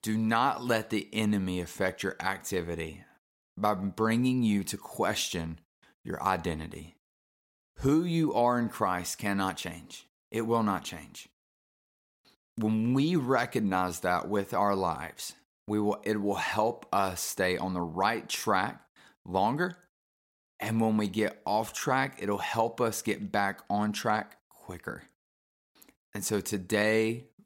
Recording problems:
none

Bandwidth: 16 kHz